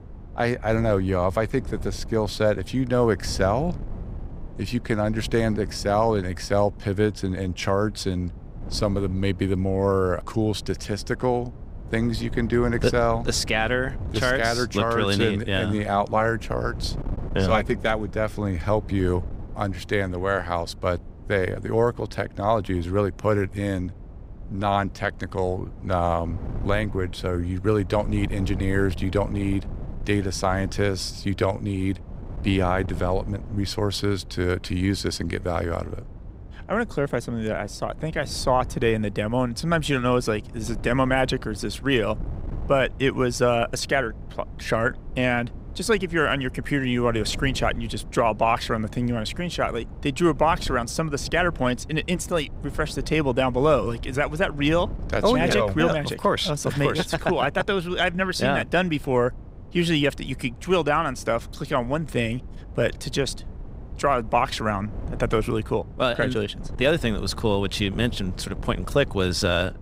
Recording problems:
wind noise on the microphone; occasional gusts; 20 dB below the speech

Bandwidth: 15.5 kHz